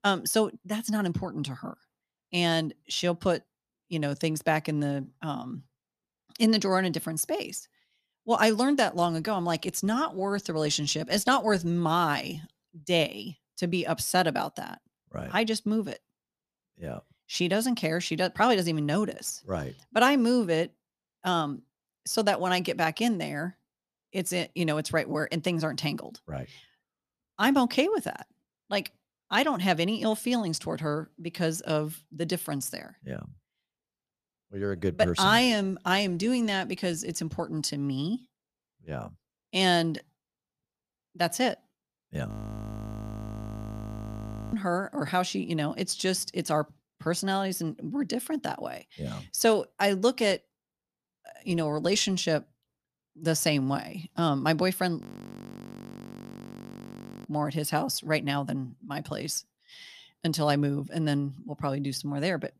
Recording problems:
audio freezing; at 42 s for 2 s and at 55 s for 2 s

